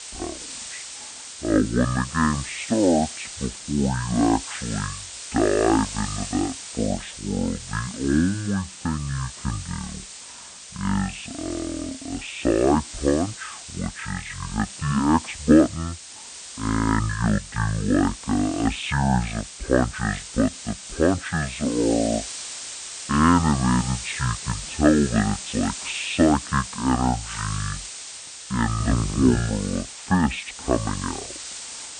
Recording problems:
high frequencies cut off; severe; nothing above 4 kHz
wrong speed and pitch; too slow and too low; 0.5 times normal speed
hiss; noticeable; throughout; 10 dB below the speech

